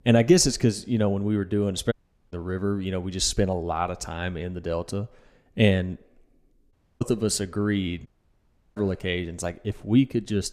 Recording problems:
audio cutting out; at 2 s, at 6.5 s and at 8 s for 0.5 s

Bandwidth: 14.5 kHz